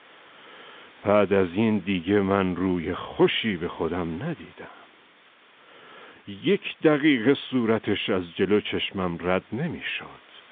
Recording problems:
phone-call audio; nothing above 3.5 kHz
hiss; faint; throughout; 25 dB below the speech

